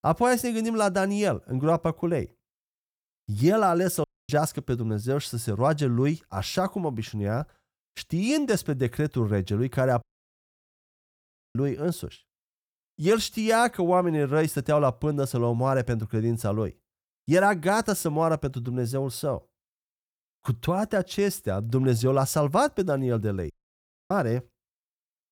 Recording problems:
audio cutting out; at 4 s, at 10 s for 1.5 s and at 24 s for 0.5 s

